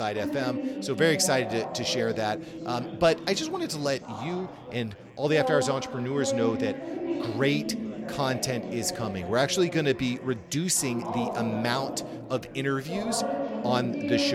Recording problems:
chatter from many people; loud; throughout; 6 dB below the speech
abrupt cut into speech; at the start and the end

